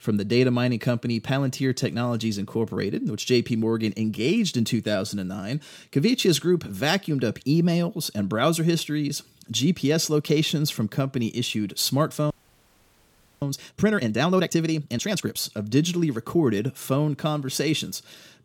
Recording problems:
audio freezing; at 12 s for 1 s

